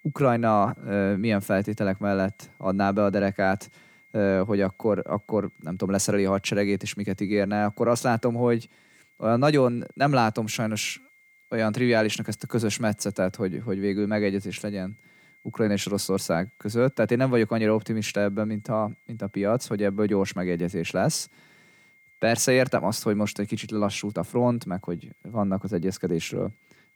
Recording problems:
high-pitched whine; faint; throughout; 2 kHz, 30 dB below the speech

